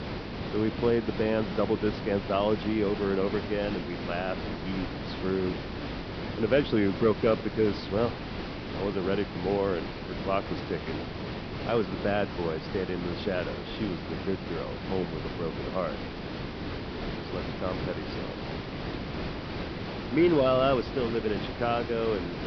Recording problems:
high frequencies cut off; noticeable; nothing above 5.5 kHz
hiss; loud; throughout; 6 dB below the speech

